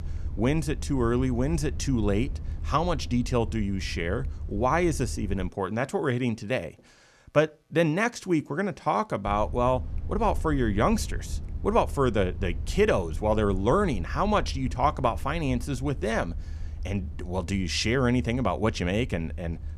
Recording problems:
low rumble; faint; until 5.5 s and from 9.5 s on; 25 dB below the speech

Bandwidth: 14.5 kHz